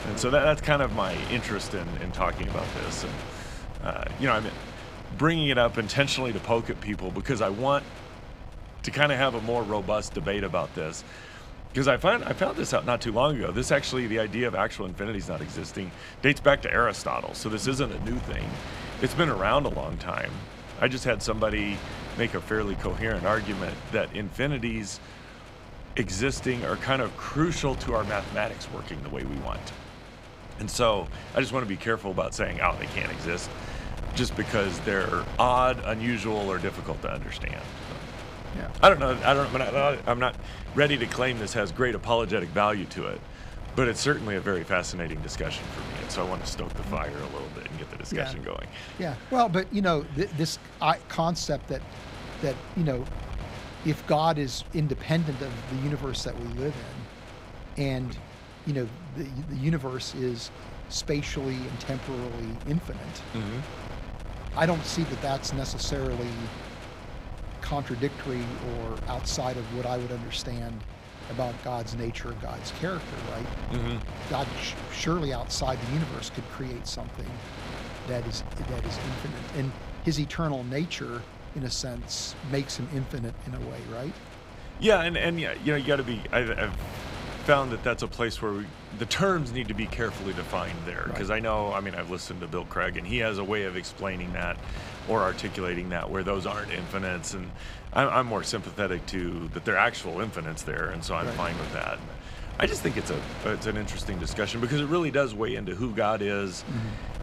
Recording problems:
wind noise on the microphone; occasional gusts; 15 dB below the speech

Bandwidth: 15.5 kHz